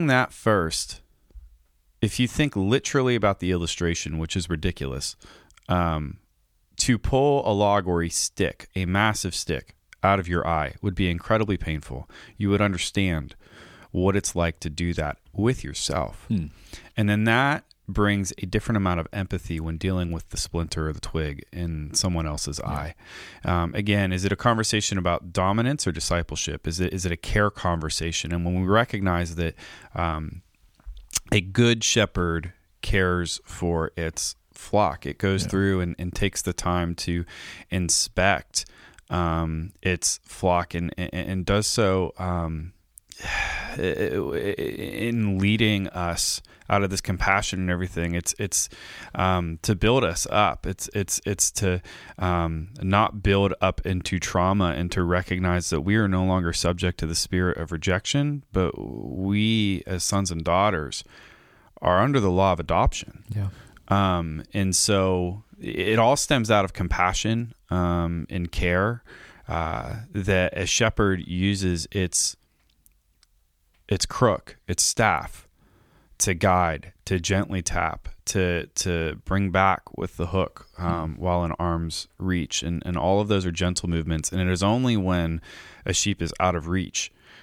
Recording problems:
abrupt cut into speech; at the start

